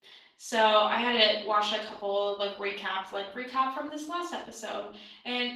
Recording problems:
off-mic speech; far
room echo; slight; dies away in 0.5 s
garbled, watery; slightly; nothing above 18.5 kHz
thin; very slightly; fading below 300 Hz

